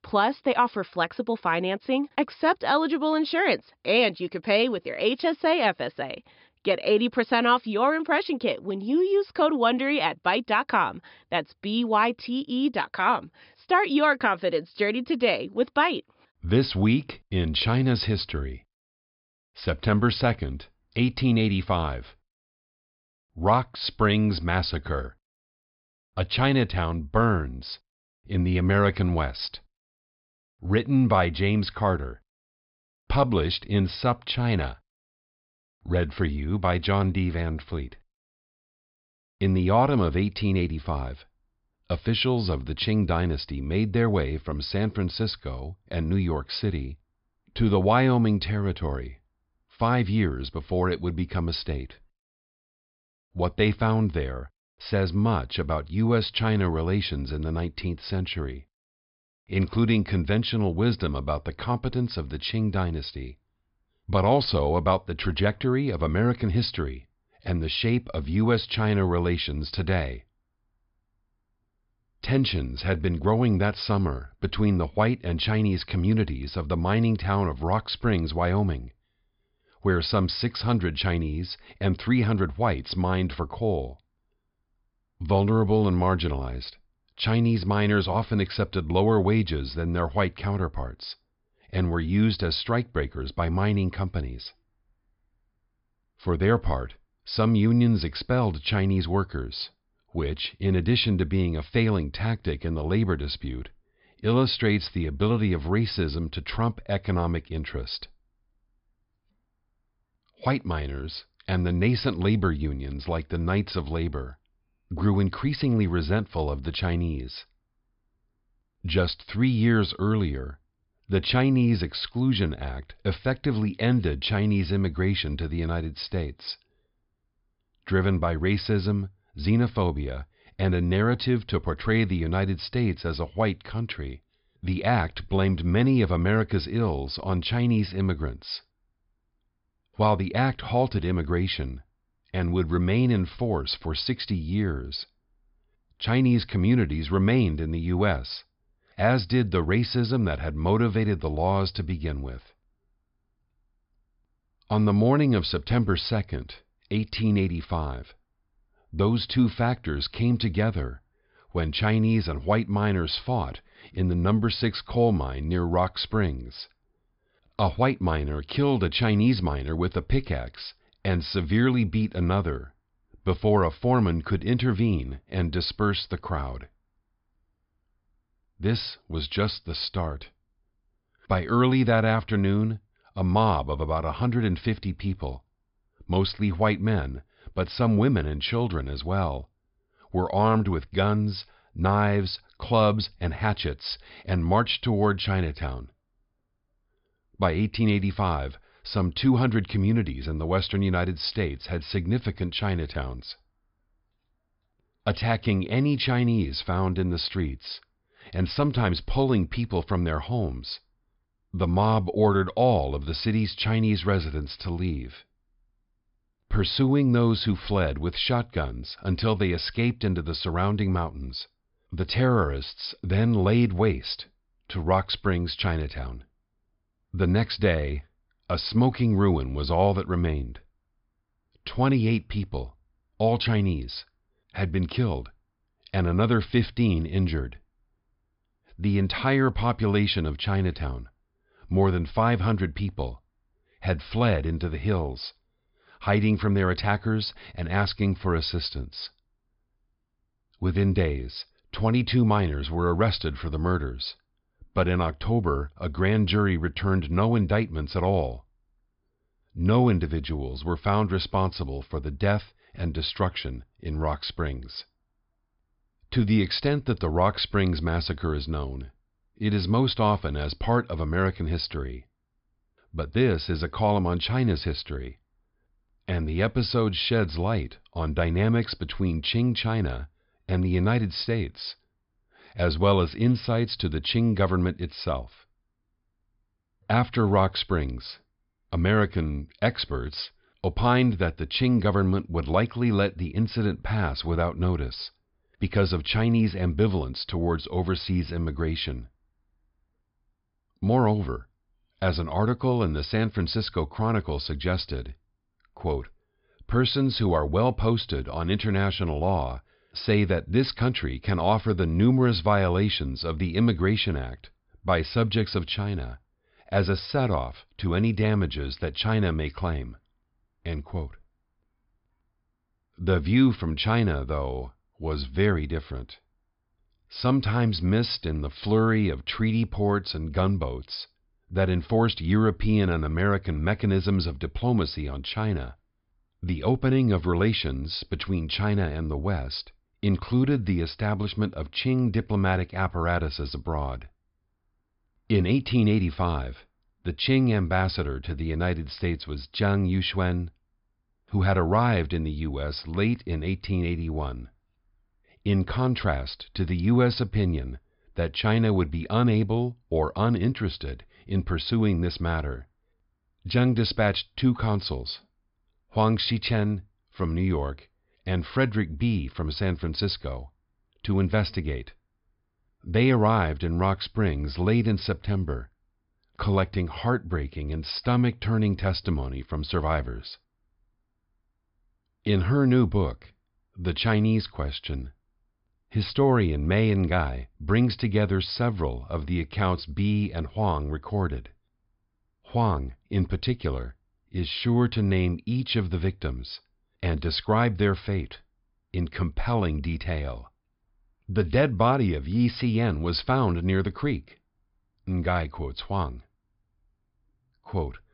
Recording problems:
high frequencies cut off; noticeable; nothing above 5 kHz

